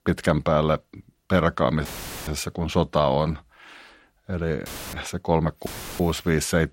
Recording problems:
audio cutting out; filled with static; at 2 s, at 4.5 s and at 5.5 s

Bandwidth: 16 kHz